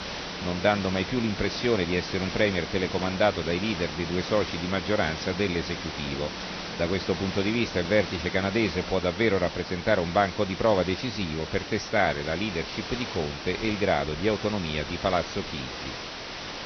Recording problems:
high frequencies cut off; noticeable; nothing above 6 kHz
garbled, watery; slightly
hiss; loud; throughout; 8 dB below the speech
machinery noise; noticeable; throughout; 20 dB below the speech

